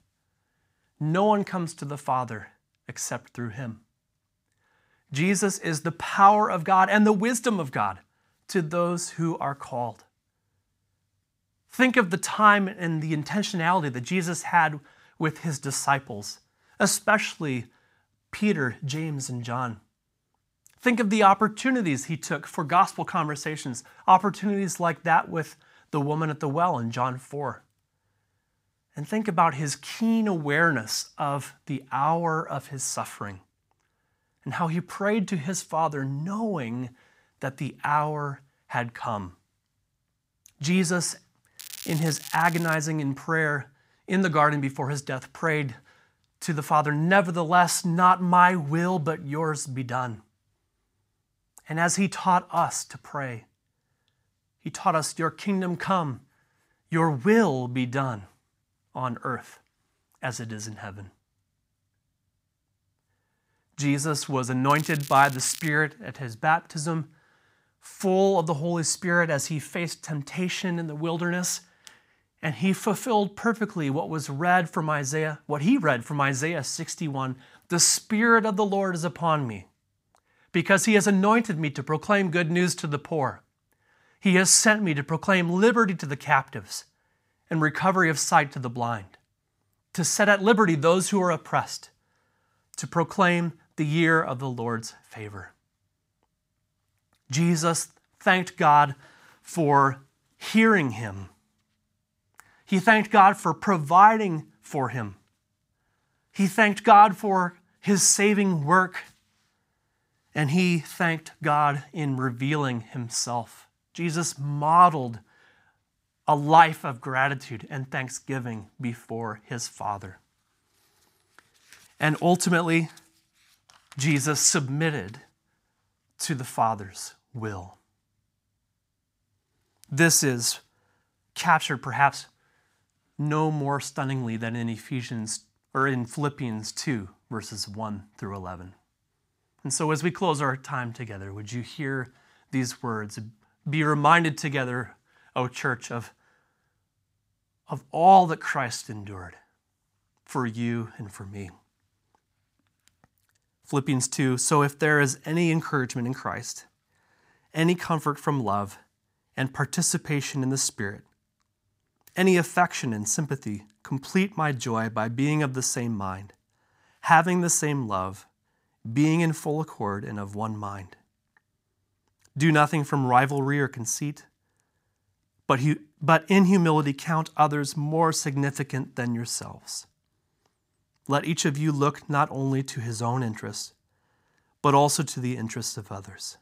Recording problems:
crackling; noticeable; from 42 to 43 s and at 1:05; 15 dB below the speech

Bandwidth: 15.5 kHz